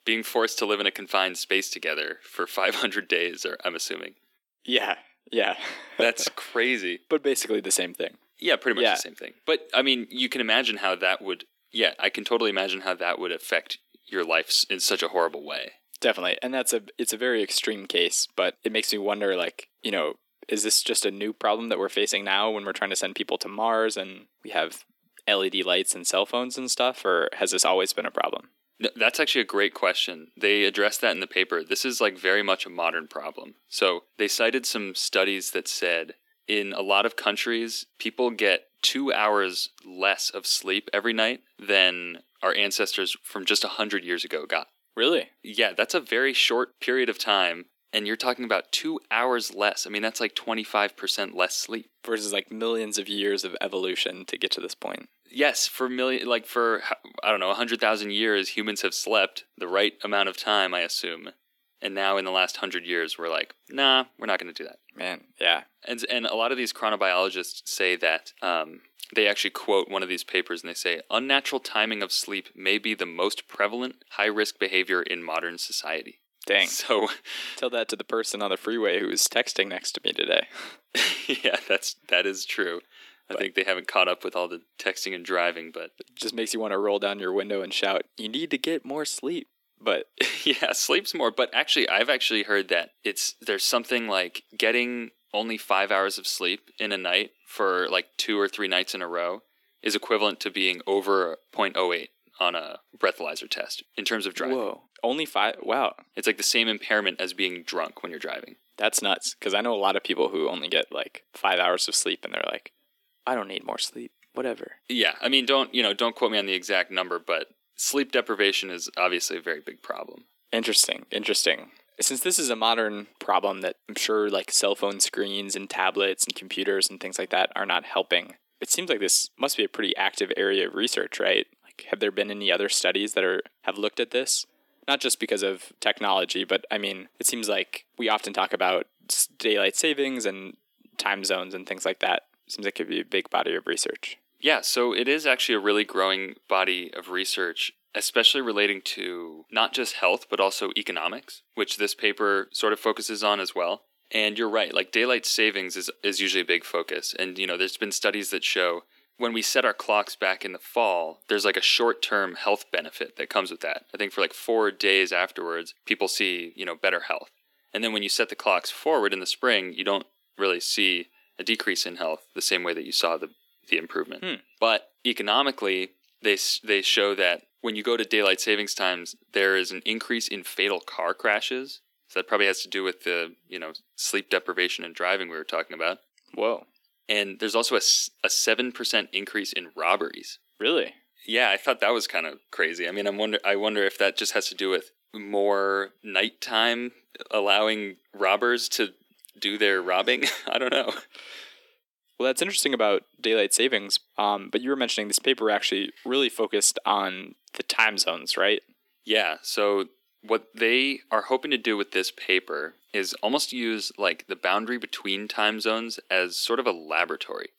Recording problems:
thin; somewhat; fading below 300 Hz

